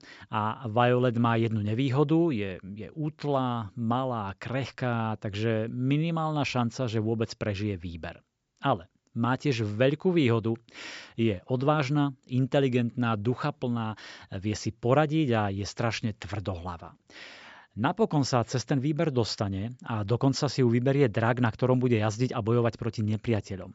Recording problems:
high frequencies cut off; noticeable; nothing above 8 kHz

